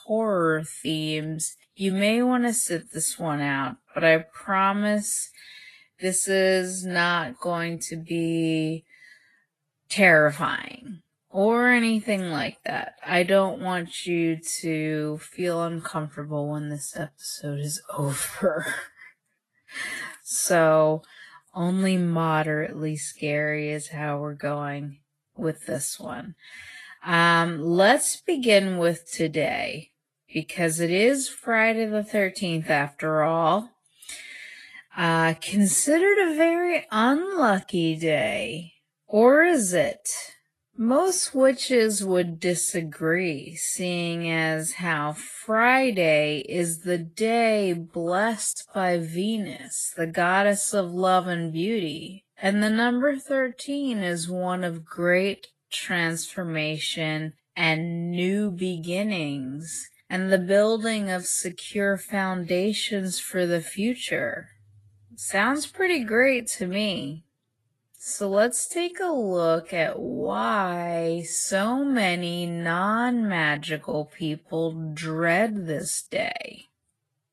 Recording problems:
wrong speed, natural pitch; too slow; 0.6 times normal speed
garbled, watery; slightly; nothing above 10.5 kHz

